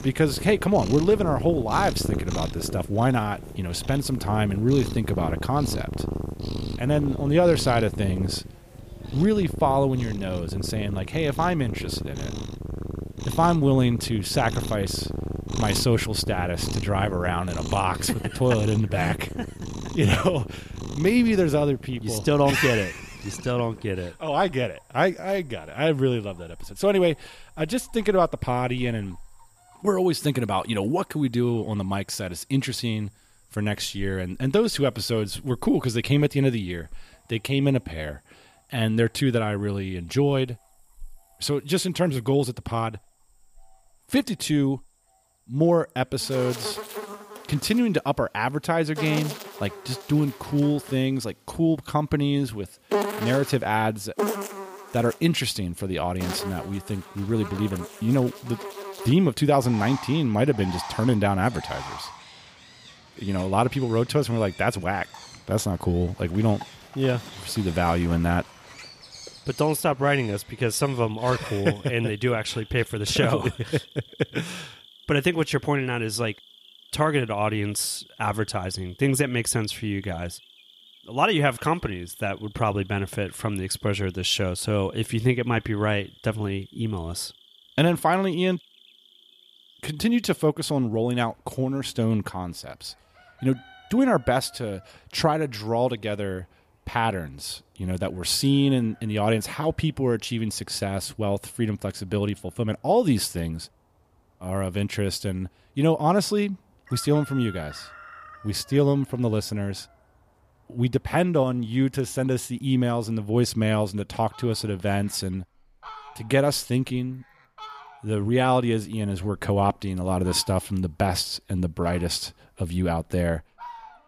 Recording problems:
animal sounds; noticeable; throughout; 10 dB below the speech

